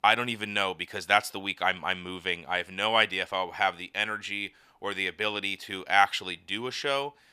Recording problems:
thin; somewhat; fading below 350 Hz

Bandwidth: 14.5 kHz